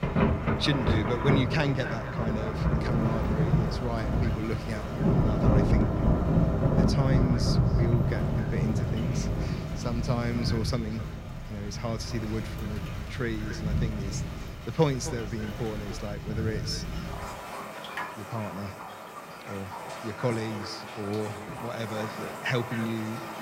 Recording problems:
echo of what is said; noticeable; throughout; 260 ms later, 15 dB below the speech
rain or running water; very loud; throughout; 3 dB above the speech

